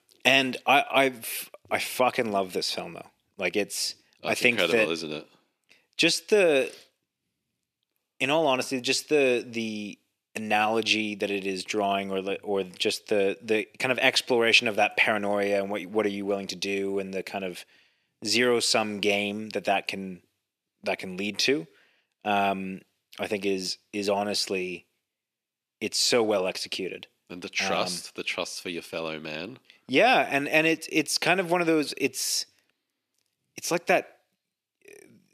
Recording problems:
thin; somewhat; fading below 350 Hz

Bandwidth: 14.5 kHz